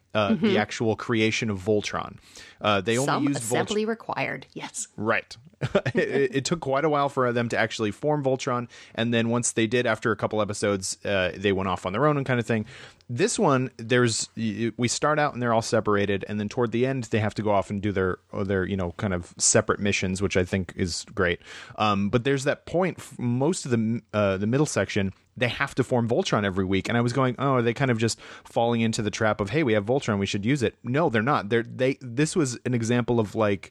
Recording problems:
none

